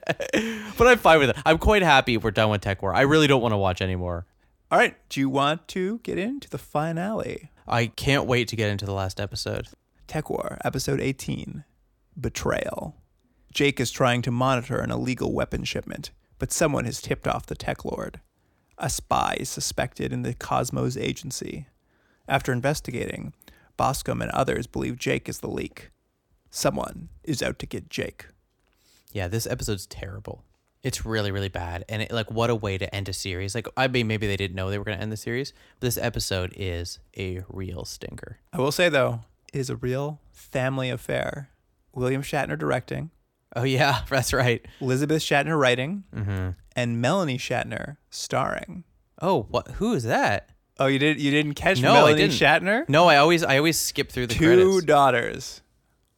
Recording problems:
none

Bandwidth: 17.5 kHz